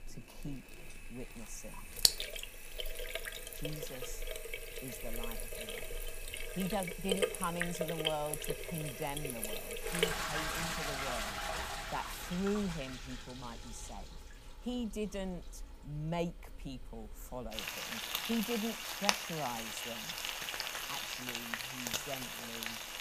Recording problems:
household noises; very loud; throughout; 4 dB above the speech

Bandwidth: 15 kHz